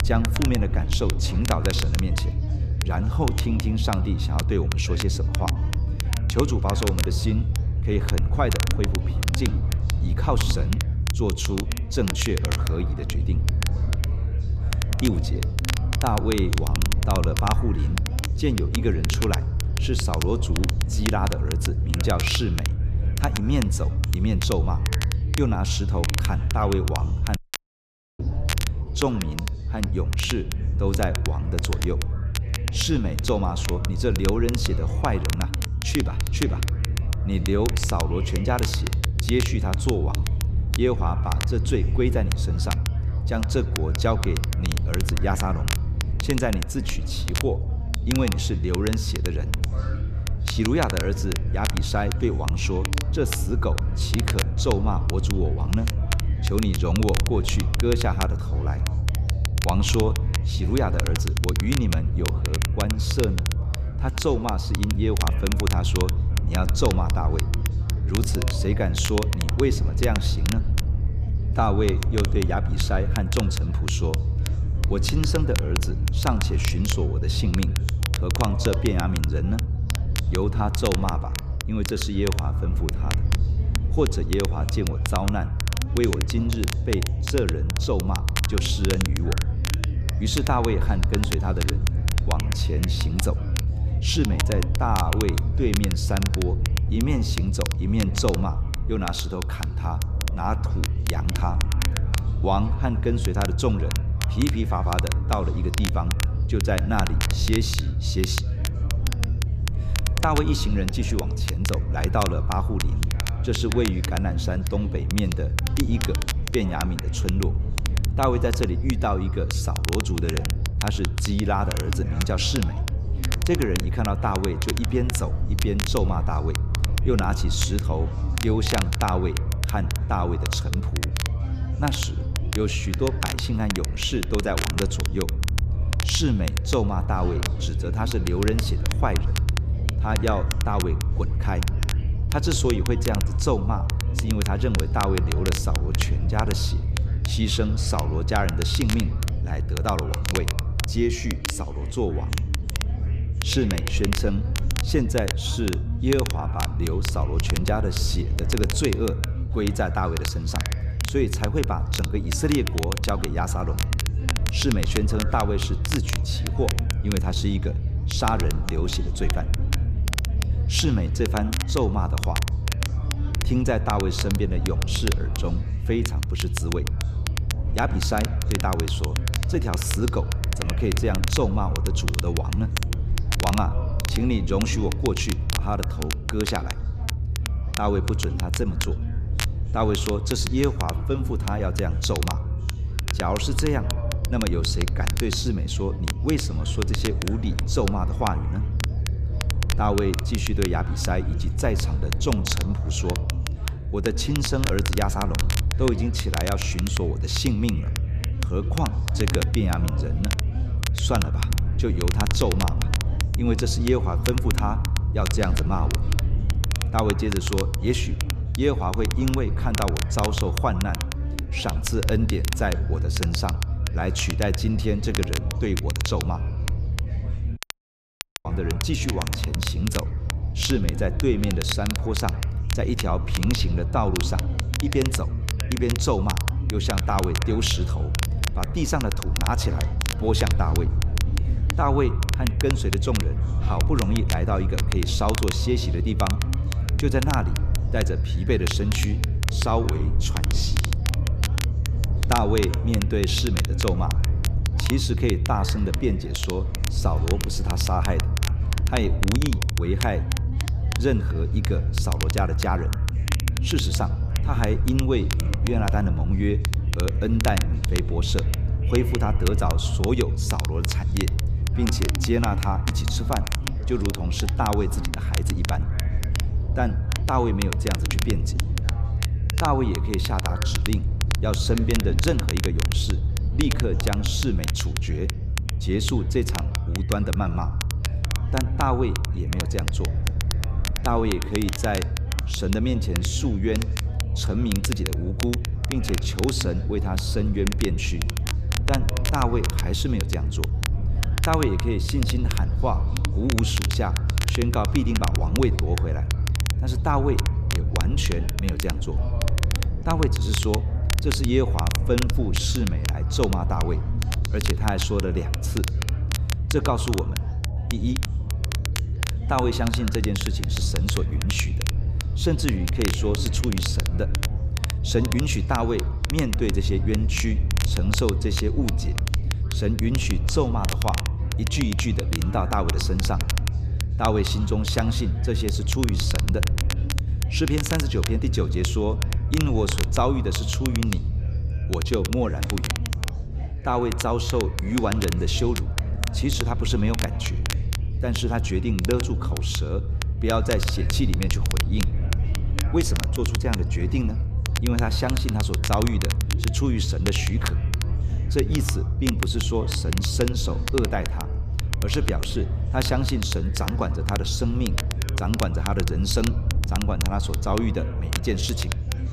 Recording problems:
echo of what is said; faint; throughout; 100 ms later, 20 dB below the speech
crackle, like an old record; loud; 6 dB below the speech
background chatter; noticeable; throughout; 4 voices, 15 dB below the speech
low rumble; noticeable; throughout; 10 dB below the speech
audio cutting out; at 27 s for 1 s and at 3:48 for 1 s

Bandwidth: 14.5 kHz